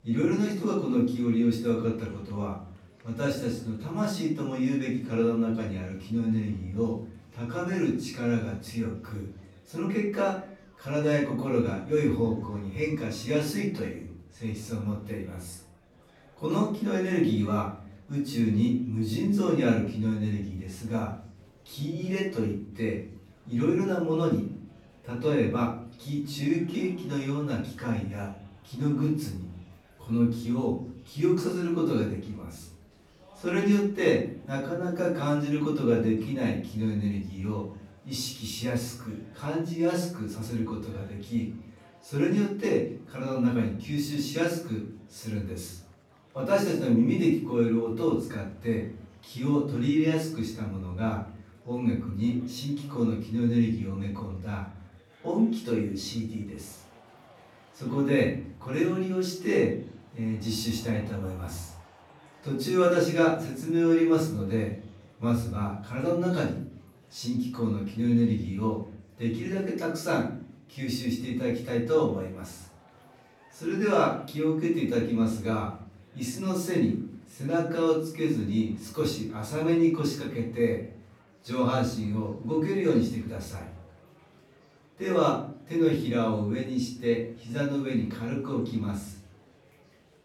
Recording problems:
off-mic speech; far
room echo; noticeable; dies away in 0.6 s
murmuring crowd; faint; throughout; 30 dB below the speech

